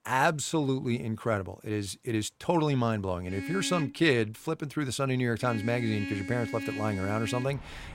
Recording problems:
traffic noise; loud; from 3.5 s on; 8 dB below the speech

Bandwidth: 16 kHz